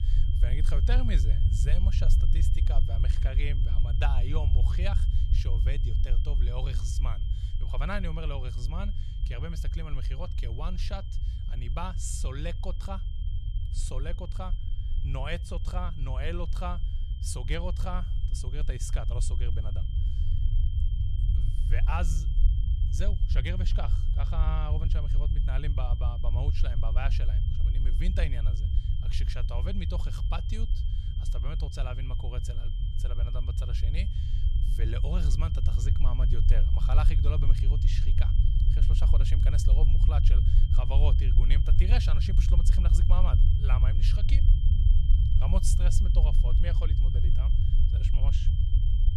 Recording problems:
low rumble; loud; throughout; 6 dB below the speech
high-pitched whine; noticeable; throughout; 3 kHz, 15 dB below the speech

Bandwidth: 14.5 kHz